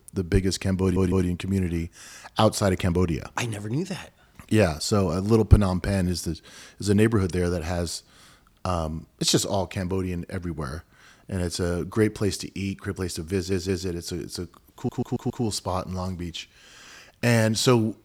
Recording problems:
audio stuttering; at 1 s, at 13 s and at 15 s

